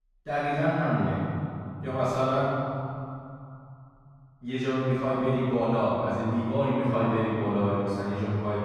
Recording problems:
room echo; strong; dies away in 2.9 s
off-mic speech; far

